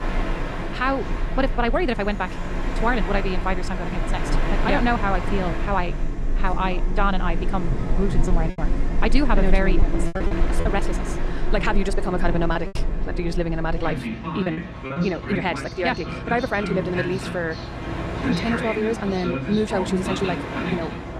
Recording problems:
wrong speed, natural pitch; too fast; 1.6 times normal speed
train or aircraft noise; loud; throughout; 2 dB below the speech
background chatter; noticeable; throughout; 4 voices, 20 dB below the speech
choppy; very; from 8.5 to 11 s and from 13 to 16 s; 9% of the speech affected

